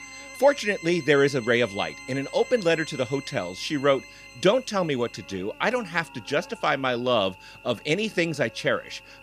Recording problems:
background music; noticeable; throughout; 15 dB below the speech
electrical hum; faint; throughout; 50 Hz, 20 dB below the speech

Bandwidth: 14.5 kHz